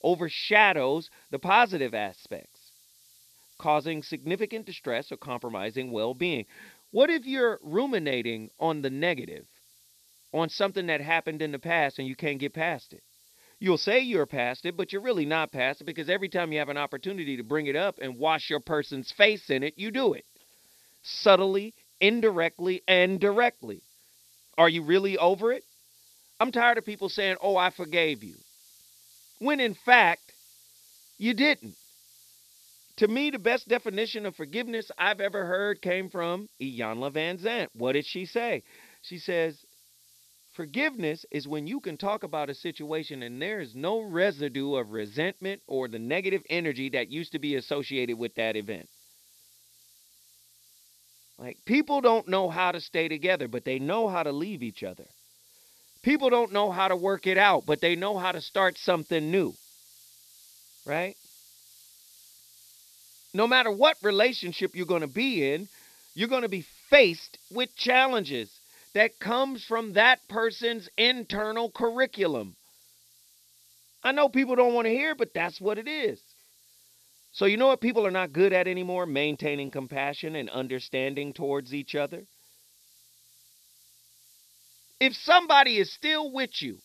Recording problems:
high frequencies cut off; noticeable; nothing above 5.5 kHz
hiss; faint; throughout; 30 dB below the speech

